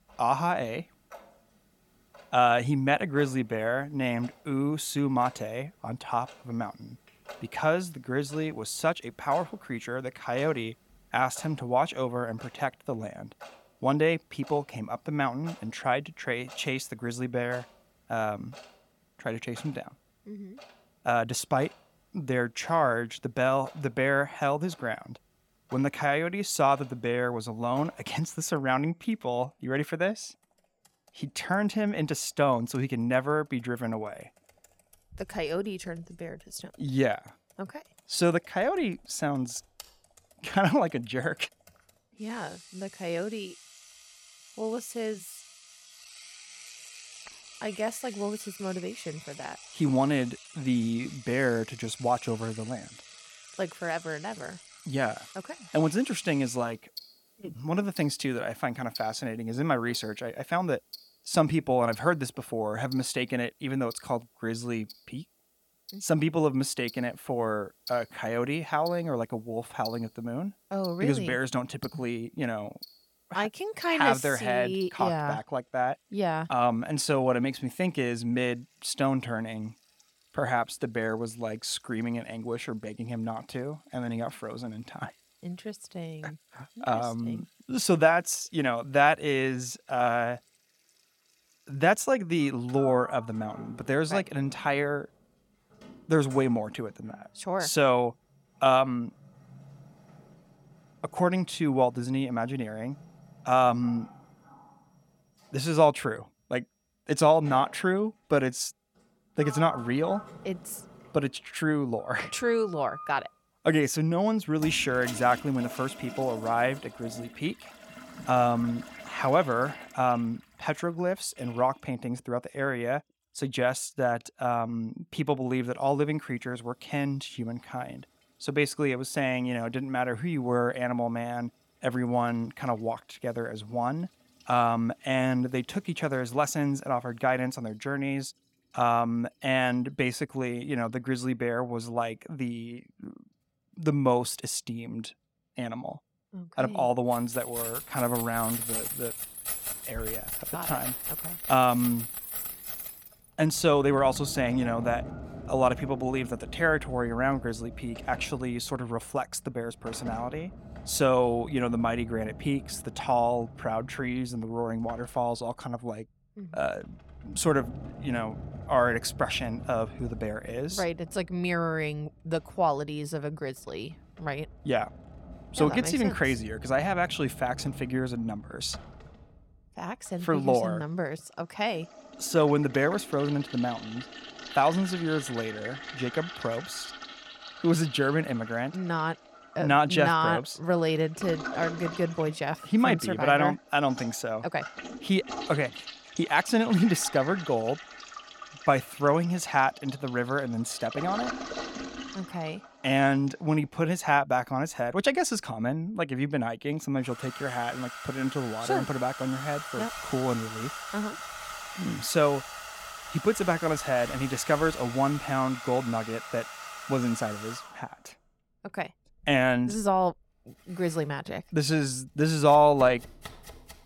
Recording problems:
household noises; noticeable; throughout; 15 dB below the speech

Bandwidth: 17 kHz